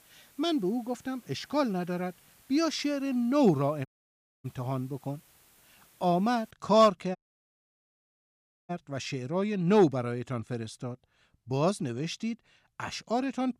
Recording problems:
hiss; faint; until 6.5 s; 30 dB below the speech
audio cutting out; at 4 s for 0.5 s and at 7 s for 1.5 s

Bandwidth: 15 kHz